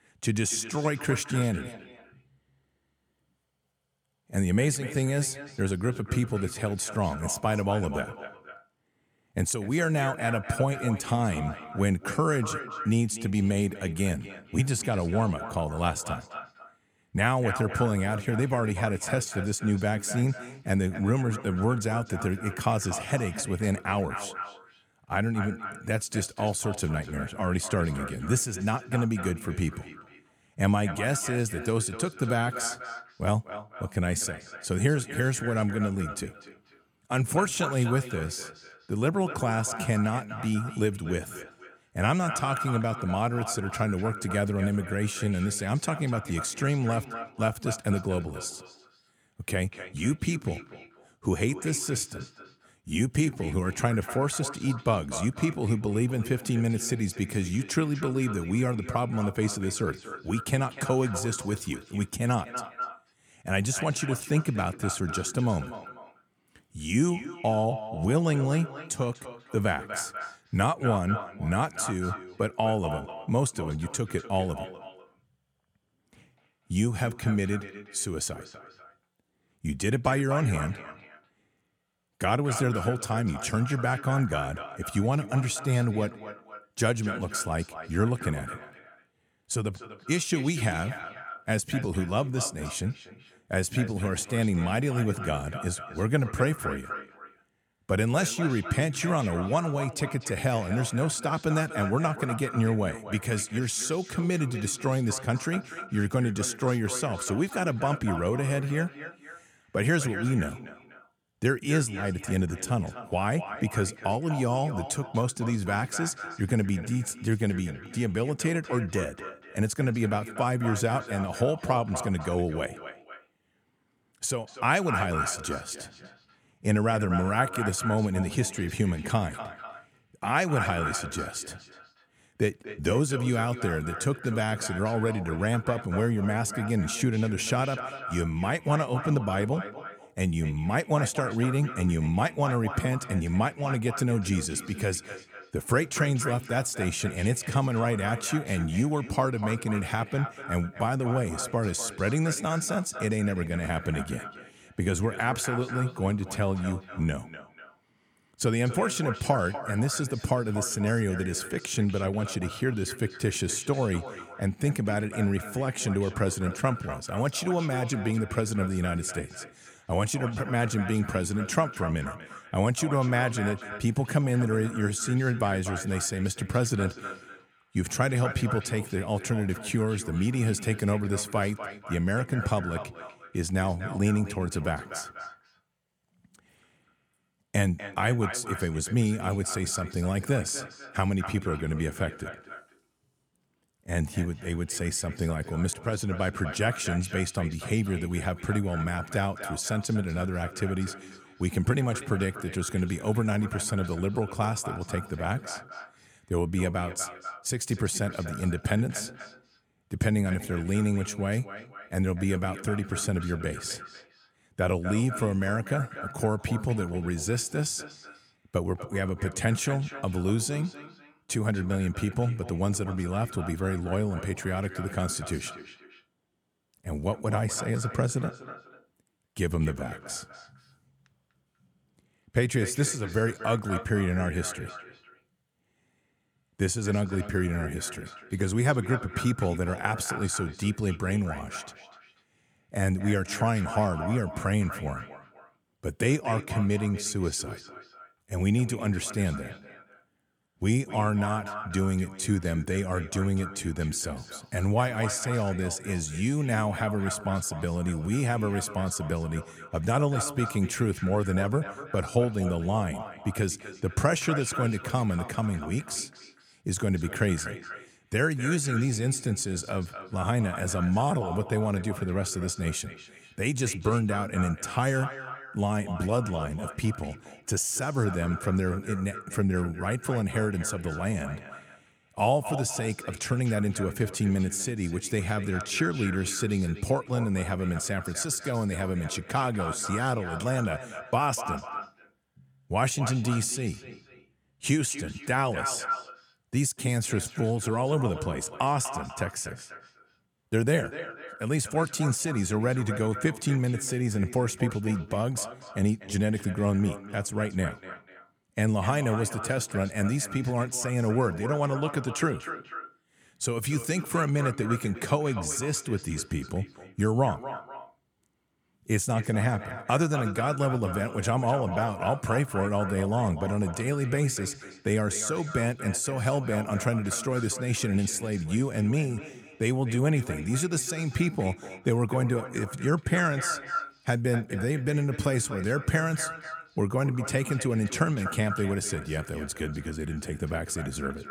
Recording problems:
echo of what is said; strong; throughout; 250 ms later, 10 dB below the speech

